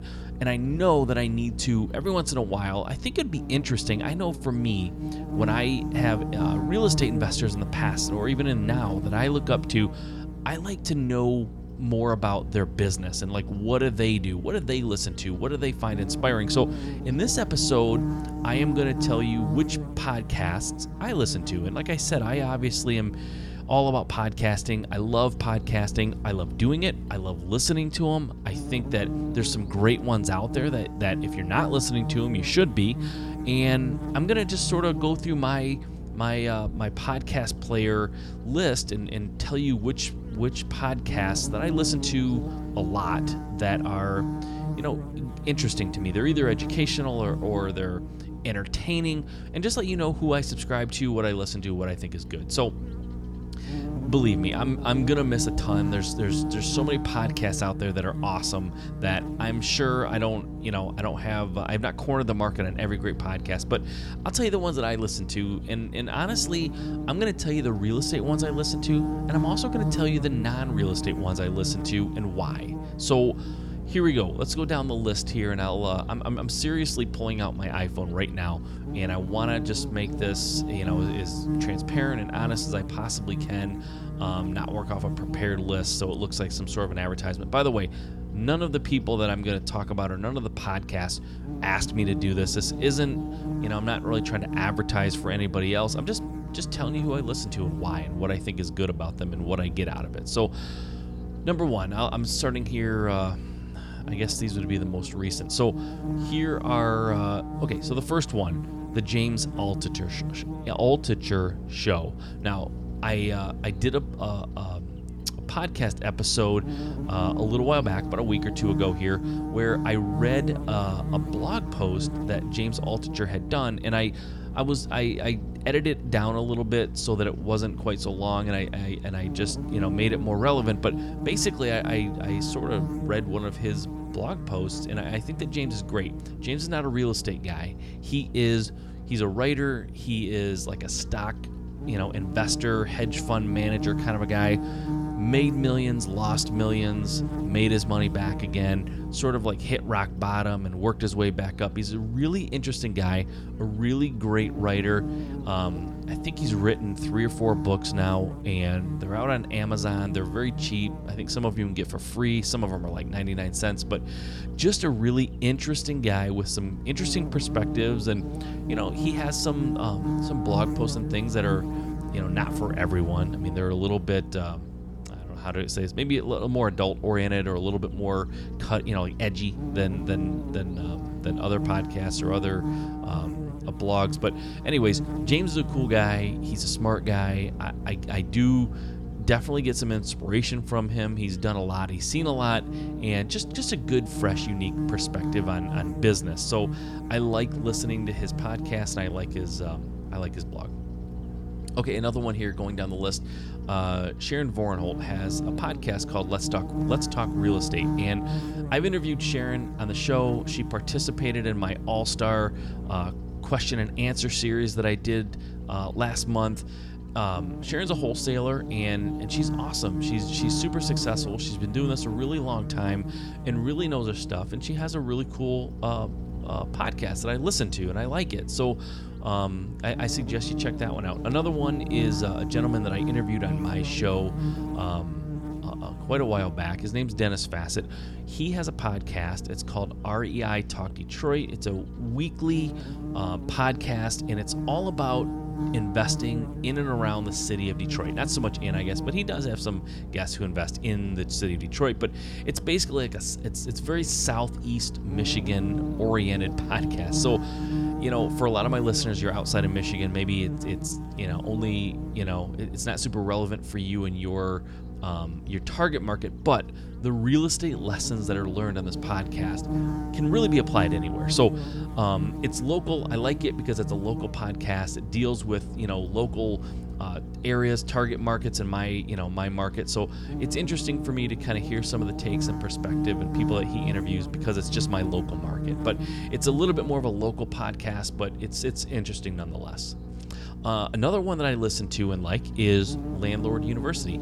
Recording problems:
electrical hum; loud; throughout; 60 Hz, 9 dB below the speech

